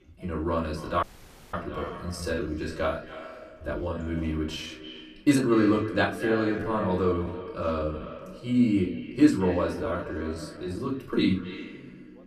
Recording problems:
off-mic speech; far
echo of what is said; noticeable; throughout; 270 ms later, 15 dB below the speech
room echo; slight; dies away in 0.3 s
background chatter; faint; throughout; 3 voices, 25 dB below the speech
audio cutting out; at 1 s for 0.5 s
uneven, jittery; strongly; from 1.5 to 11 s

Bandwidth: 14.5 kHz